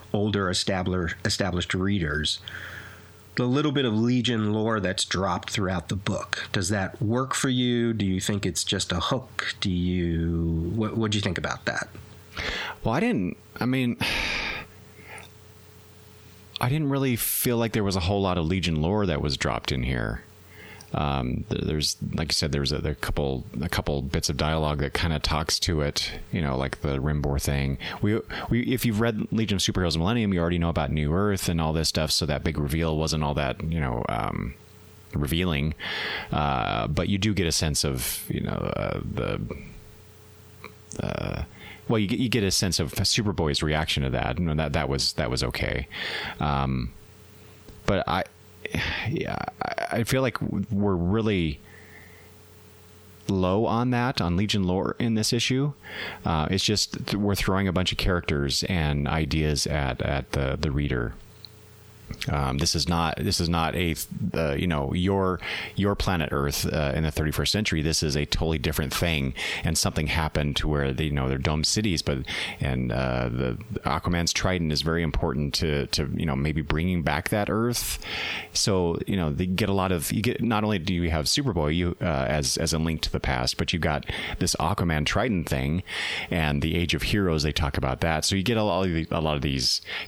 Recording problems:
squashed, flat; heavily

